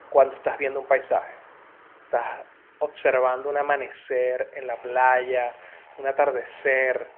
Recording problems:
phone-call audio
traffic noise; faint; throughout; 25 dB below the speech

